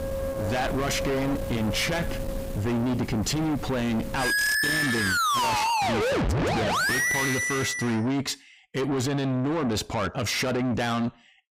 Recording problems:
distortion; heavy; 6 dB below the speech
background music; very loud; until 7.5 s; 2 dB above the speech

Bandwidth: 15.5 kHz